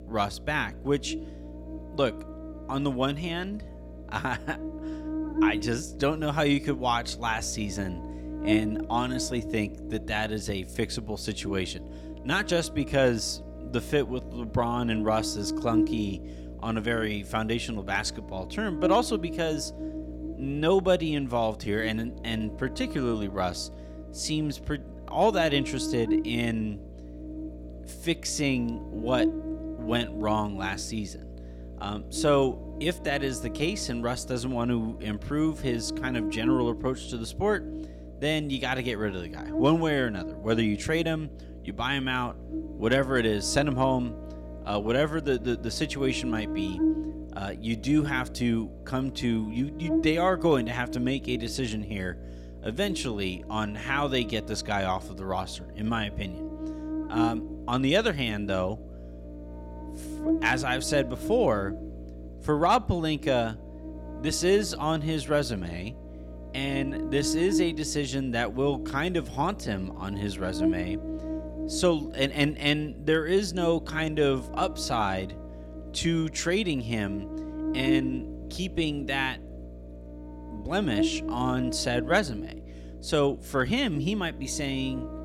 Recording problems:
electrical hum; noticeable; throughout; 60 Hz, 10 dB below the speech

